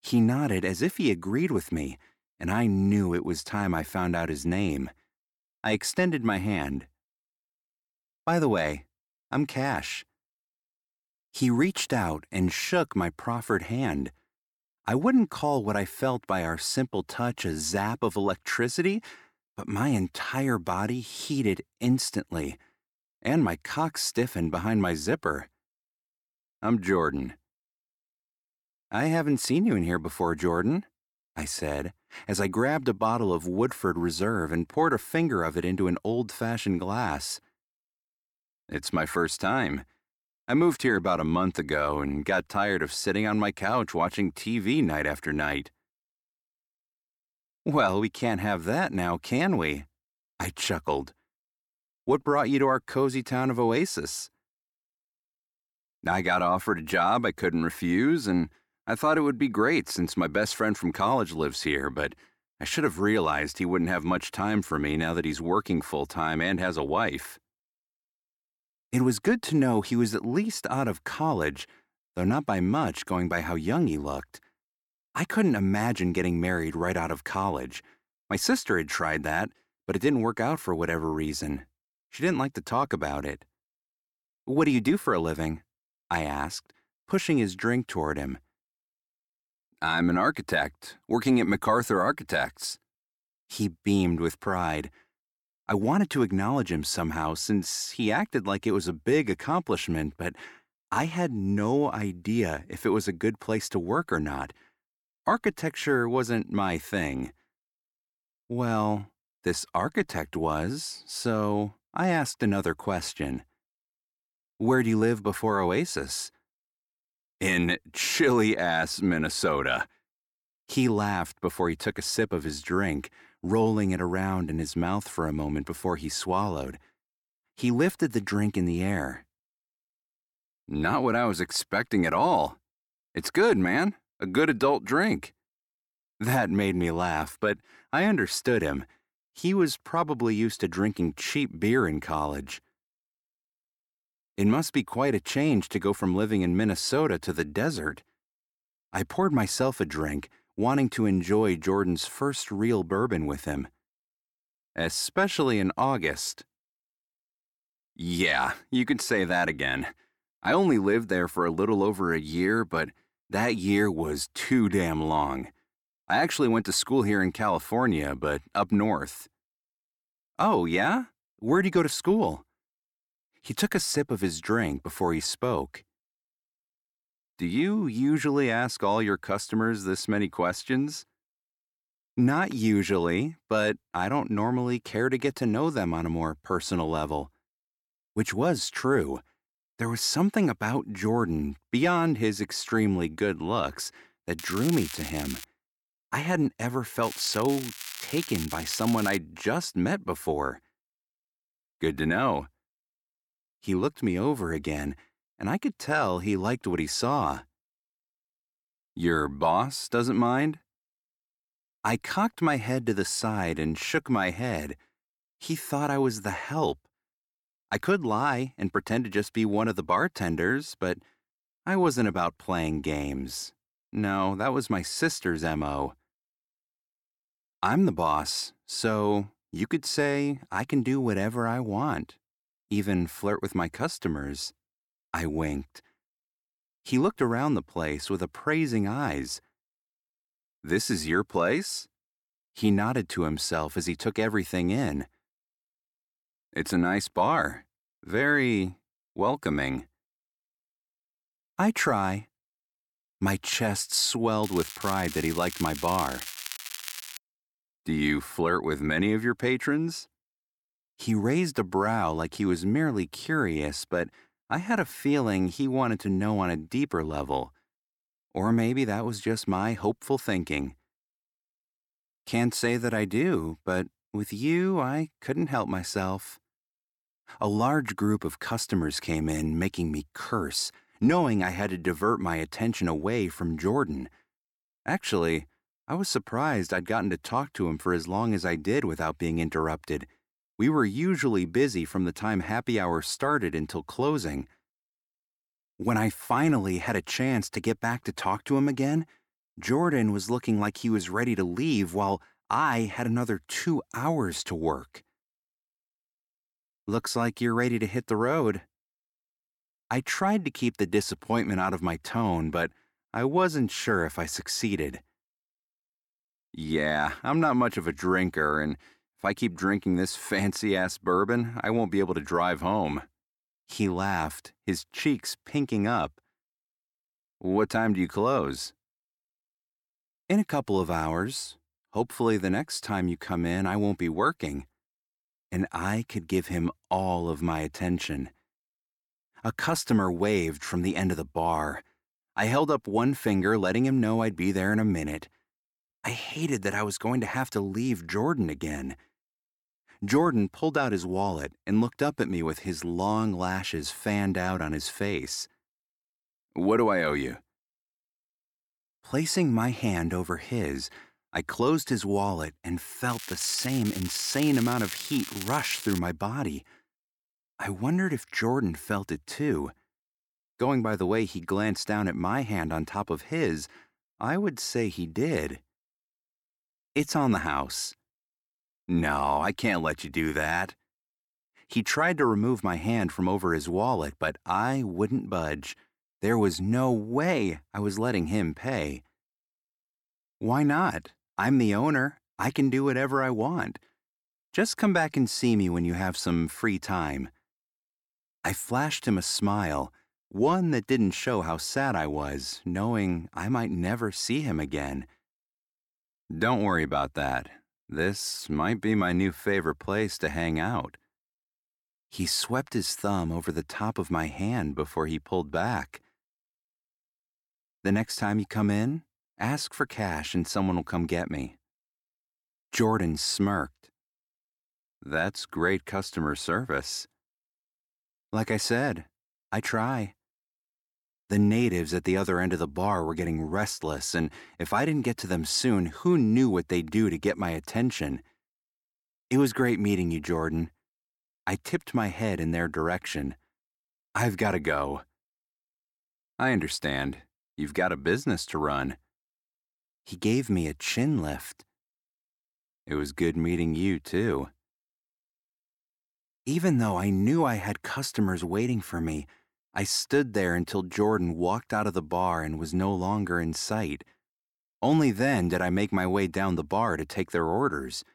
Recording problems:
crackling; loud; 4 times, first at 3:14; 10 dB below the speech

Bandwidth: 17.5 kHz